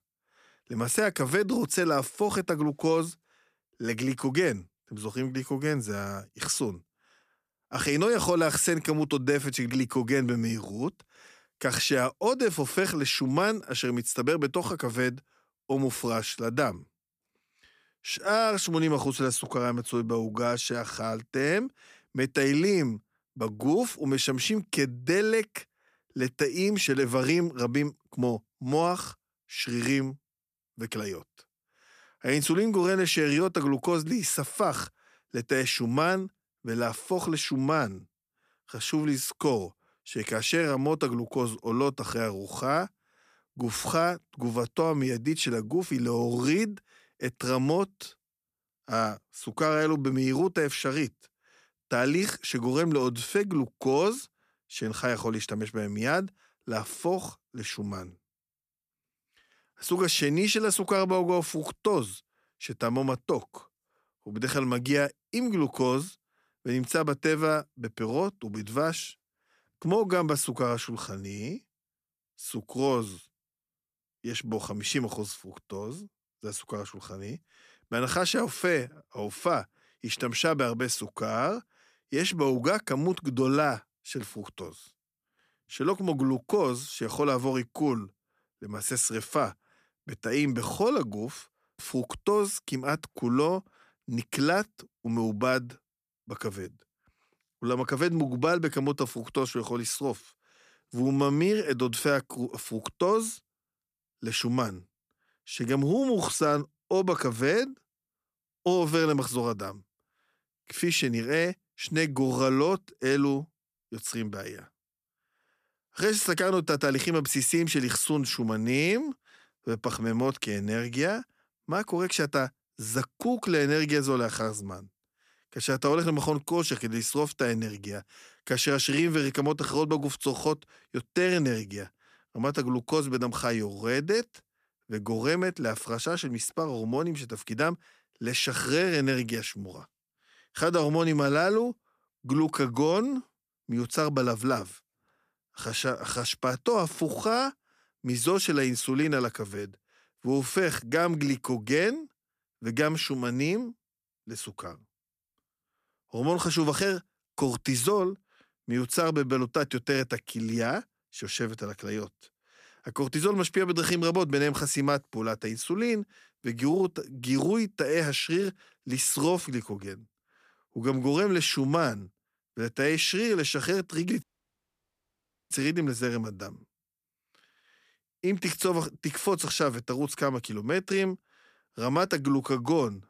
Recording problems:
audio cutting out; at 2:54 for 1.5 s

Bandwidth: 14.5 kHz